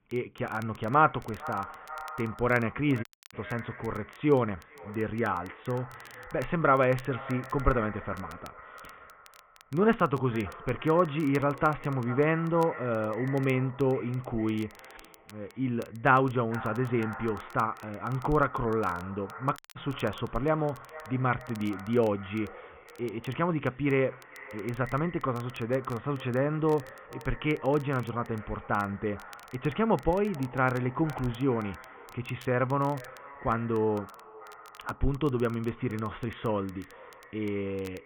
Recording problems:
high frequencies cut off; severe; nothing above 3.5 kHz
echo of what is said; noticeable; throughout; 450 ms later, 15 dB below the speech
crackle, like an old record; faint; 25 dB below the speech
audio cutting out; at 3 s and at 20 s

